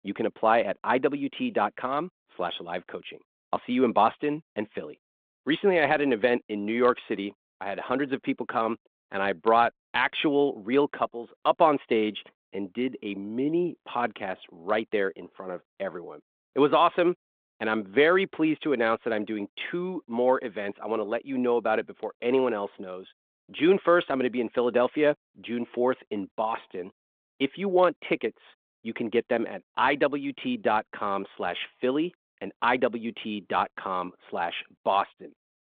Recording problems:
phone-call audio

